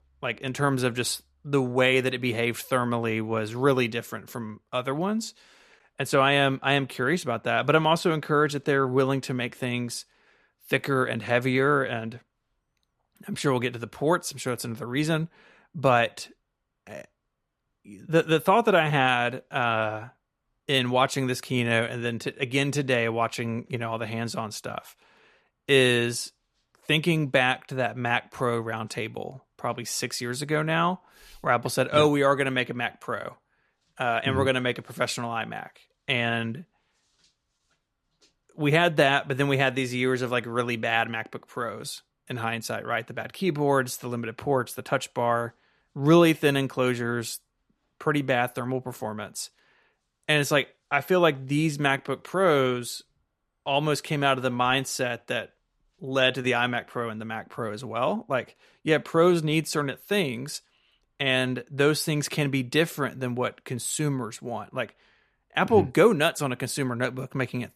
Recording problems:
none

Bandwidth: 14 kHz